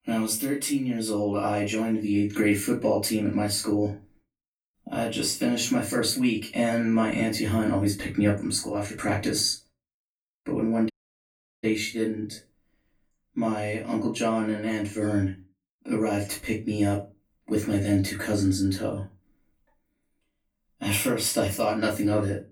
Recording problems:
off-mic speech; far
room echo; slight; dies away in 0.2 s
audio cutting out; at 11 s for 0.5 s

